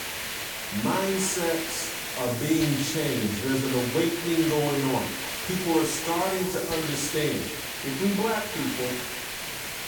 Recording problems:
off-mic speech; far
echo of what is said; noticeable; throughout; 280 ms later, 15 dB below the speech
room echo; slight; dies away in 0.4 s
hiss; loud; throughout; 3 dB below the speech
voice in the background; faint; throughout; 30 dB below the speech

